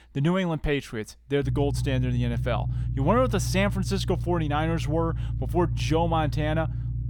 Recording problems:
low rumble; noticeable; from 1.5 s on; 15 dB below the speech

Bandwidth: 18.5 kHz